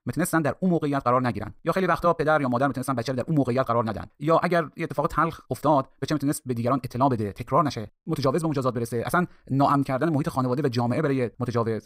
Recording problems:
wrong speed, natural pitch; too fast; 1.7 times normal speed

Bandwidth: 15.5 kHz